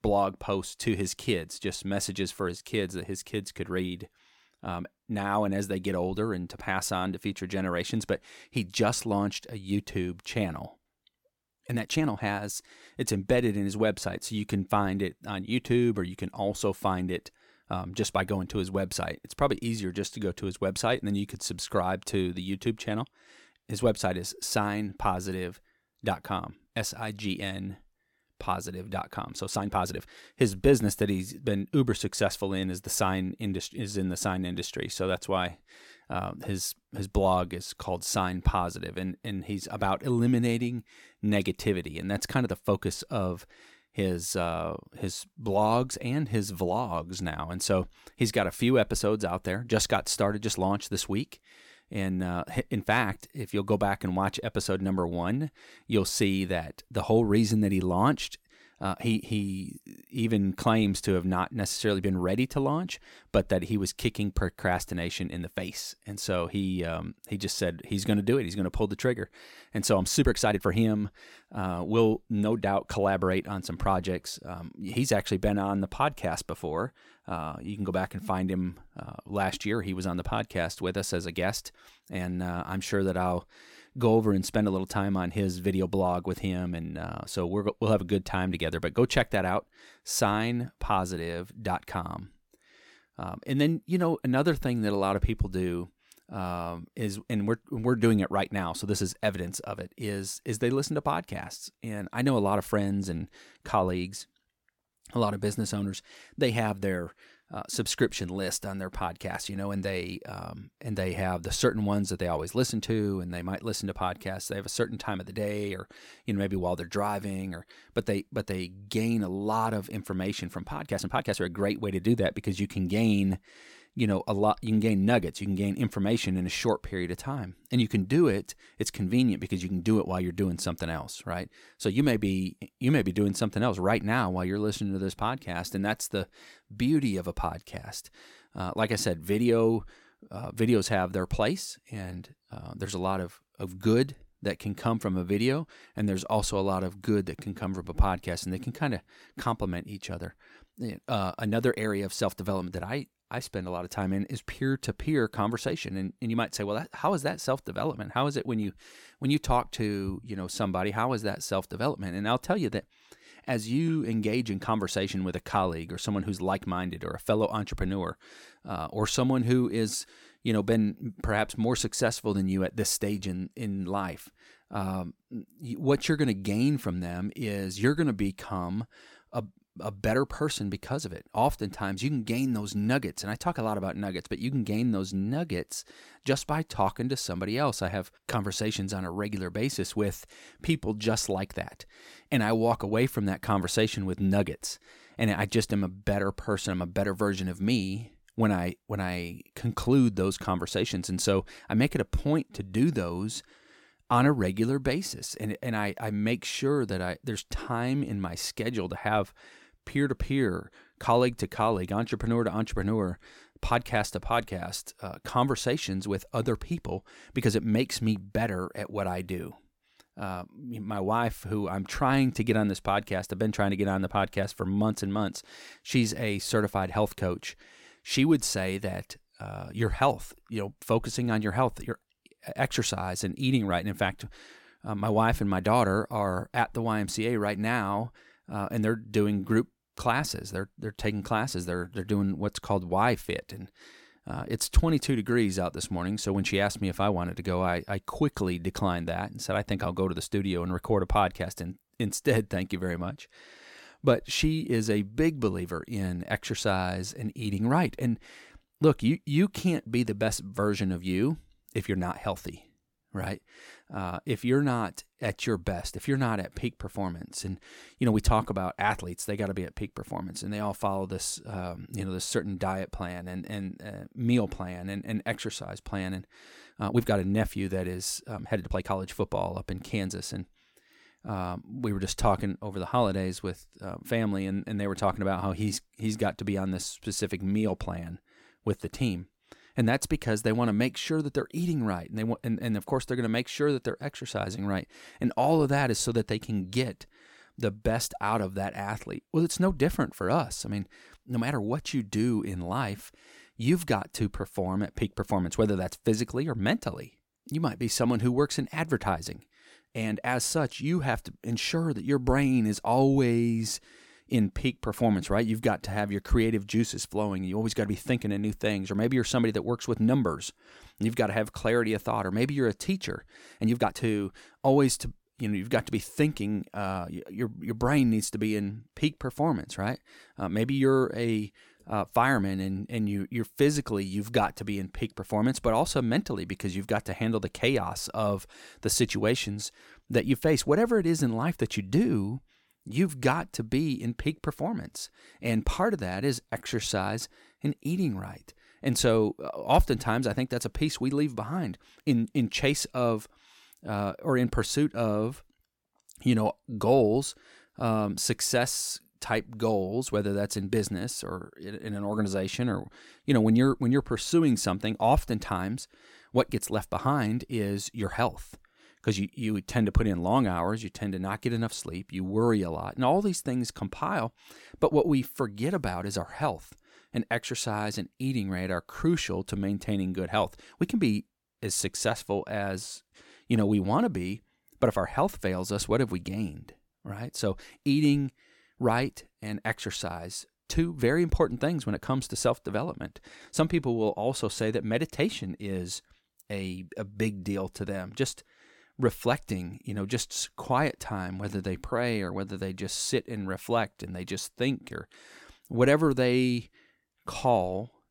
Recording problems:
uneven, jittery; strongly; from 12 s to 5:58

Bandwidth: 17 kHz